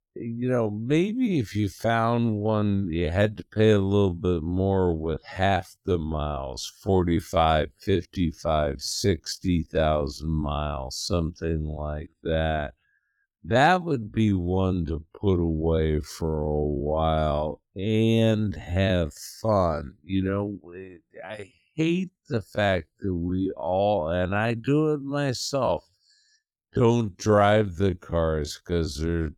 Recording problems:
wrong speed, natural pitch; too slow; 0.5 times normal speed

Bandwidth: 17.5 kHz